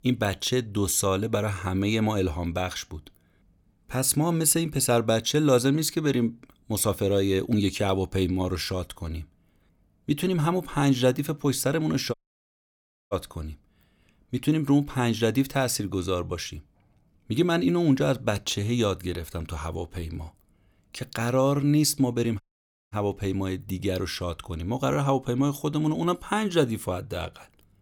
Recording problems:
audio cutting out; at 12 s for 1 s and at 22 s for 0.5 s

